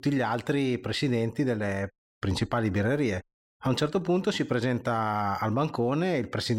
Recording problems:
abrupt cut into speech; at the end

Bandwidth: 16 kHz